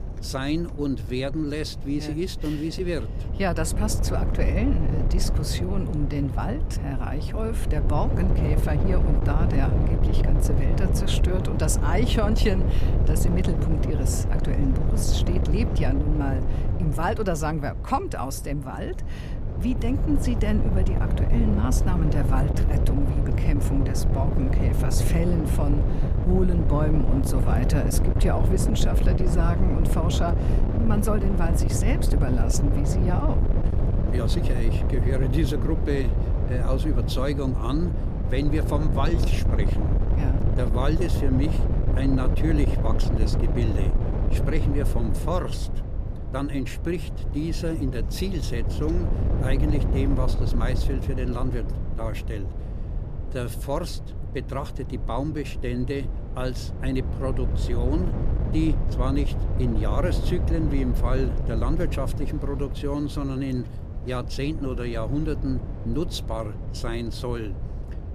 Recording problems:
wind noise on the microphone; heavy; 4 dB below the speech

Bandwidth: 15 kHz